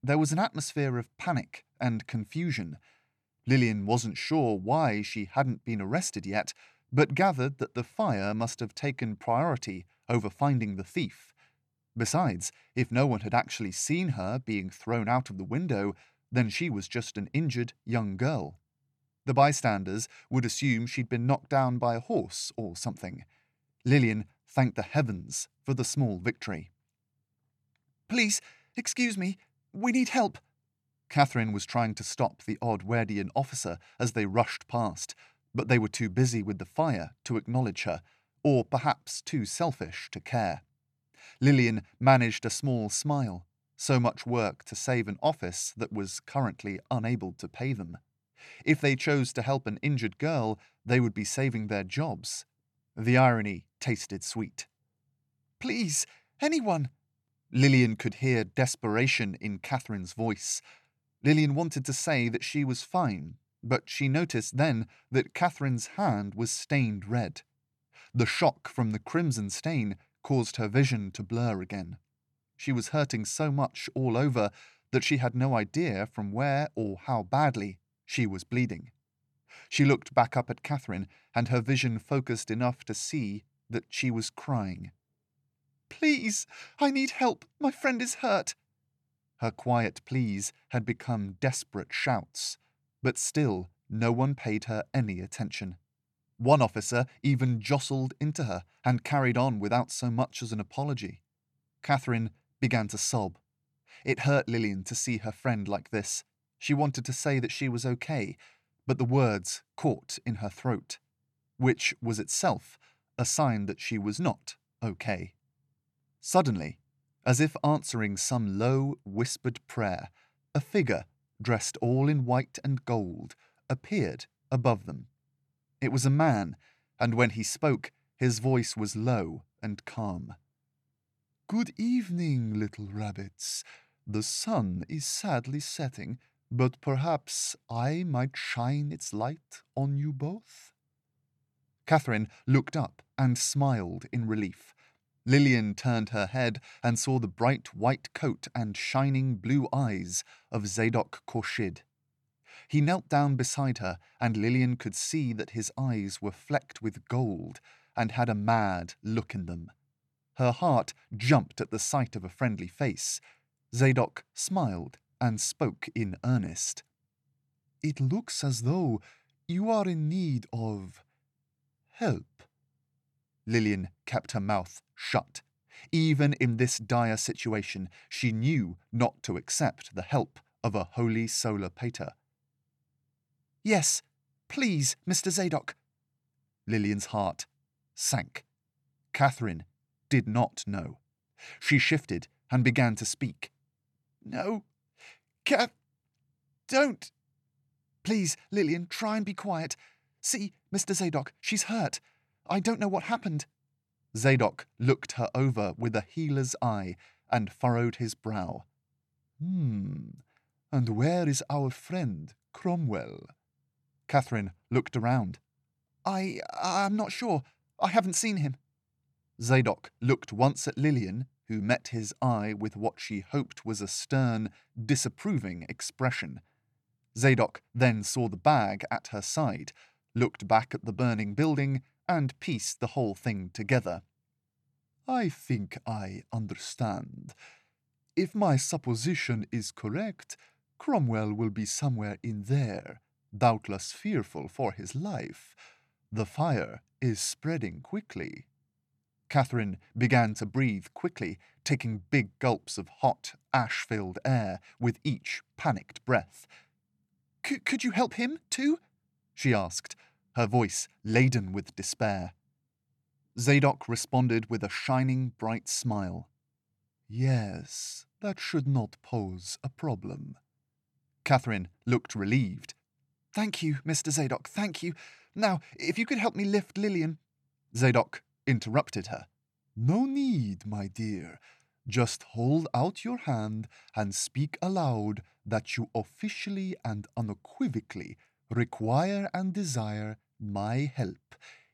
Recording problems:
none

